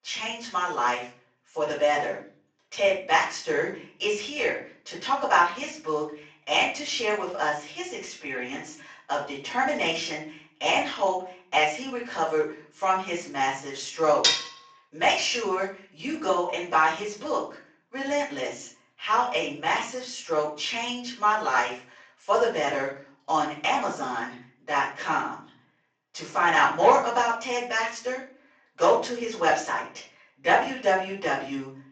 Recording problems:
off-mic speech; far
room echo; noticeable; dies away in 0.5 s
thin; somewhat; fading below 700 Hz
garbled, watery; slightly; nothing above 7.5 kHz
clattering dishes; loud; at 14 s; peak 5 dB above the speech

